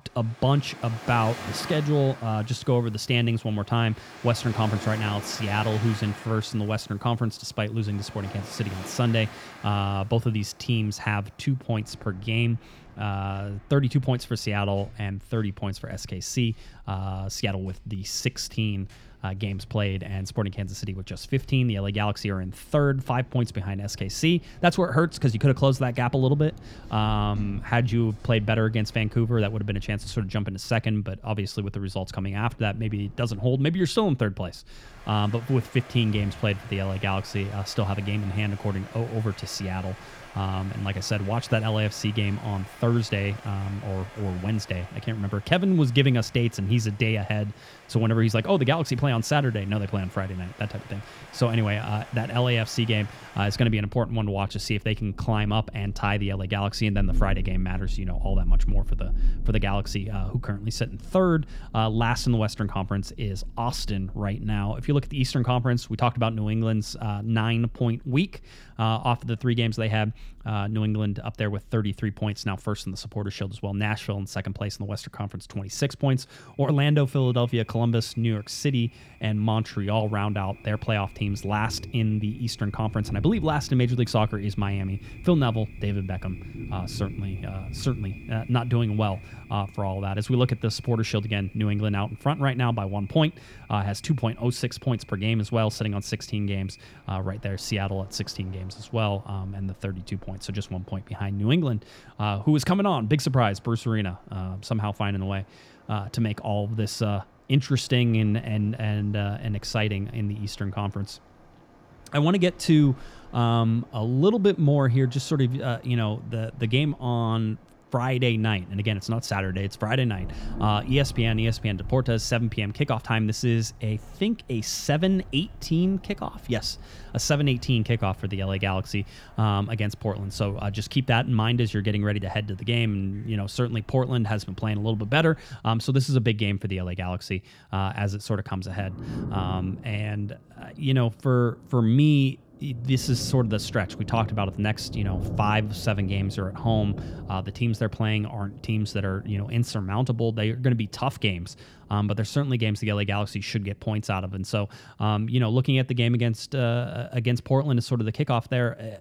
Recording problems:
rain or running water; noticeable; throughout; 15 dB below the speech

